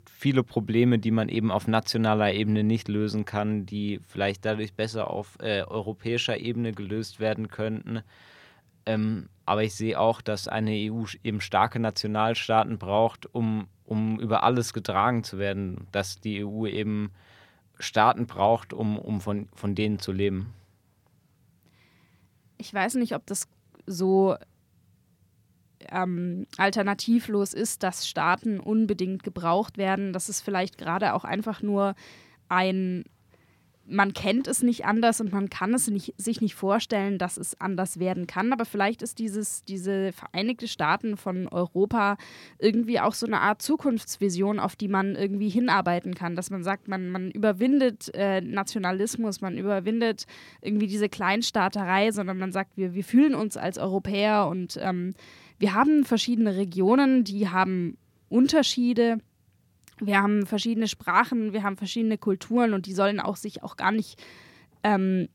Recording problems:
none

